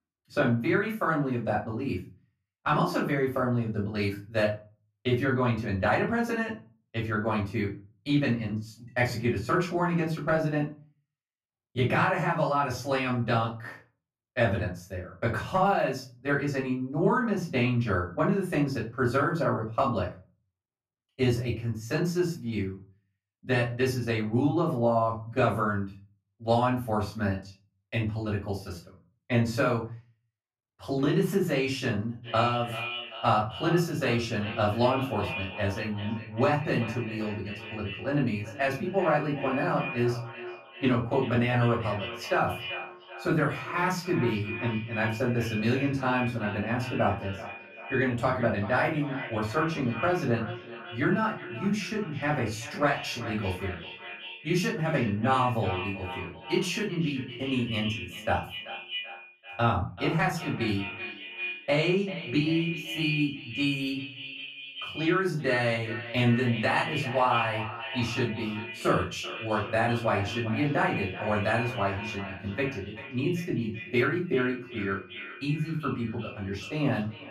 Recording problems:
echo of what is said; strong; from 32 s on; 390 ms later, 10 dB below the speech
off-mic speech; far
room echo; slight; dies away in 0.3 s

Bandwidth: 14.5 kHz